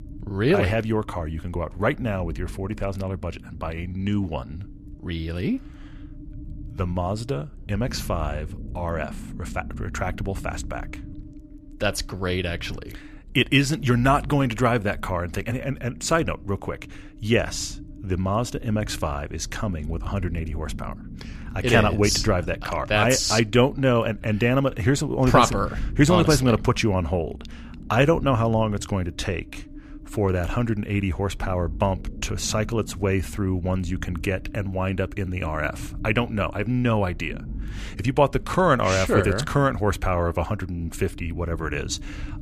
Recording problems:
low rumble; faint; throughout; 25 dB below the speech

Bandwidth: 14.5 kHz